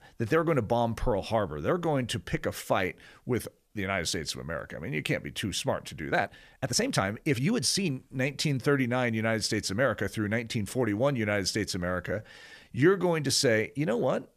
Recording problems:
uneven, jittery; strongly; from 6 to 13 s

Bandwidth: 14.5 kHz